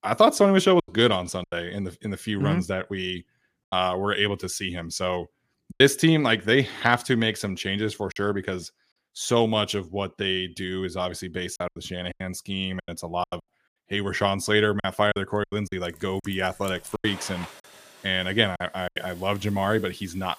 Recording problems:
household noises; noticeable; from 16 s on; 20 dB below the speech
choppy; very; 7% of the speech affected

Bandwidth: 15 kHz